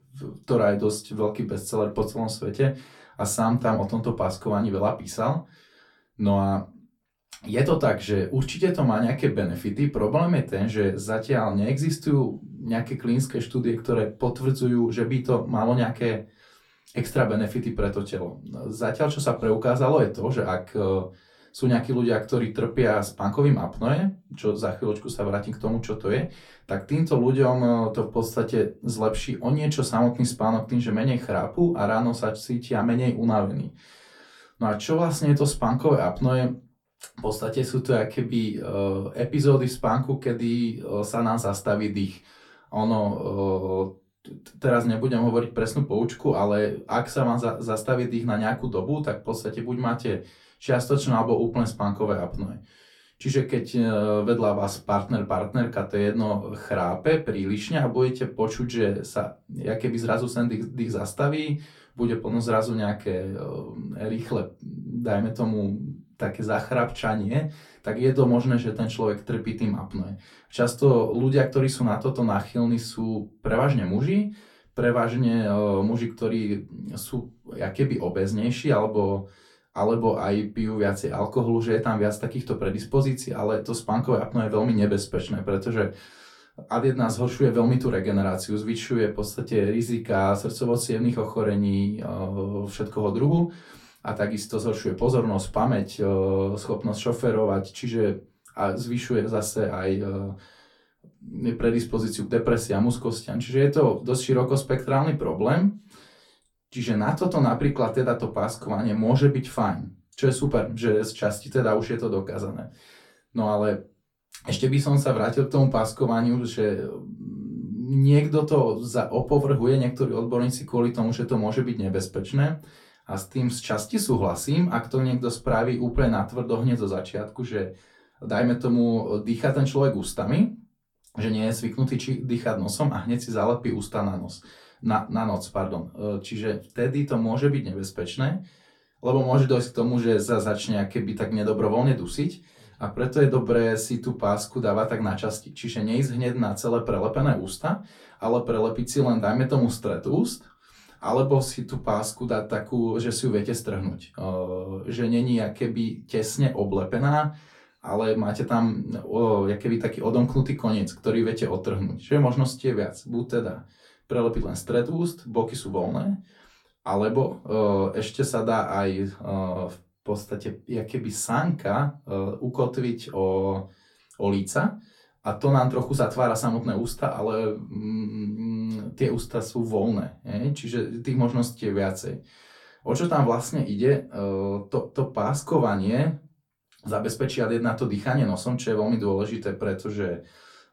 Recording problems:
off-mic speech; far
room echo; very slight; dies away in 0.2 s

